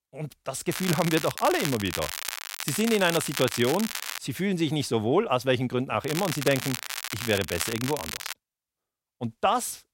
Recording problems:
crackling; loud; from 0.5 to 4 s and from 6 to 8.5 s; 6 dB below the speech

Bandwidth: 16 kHz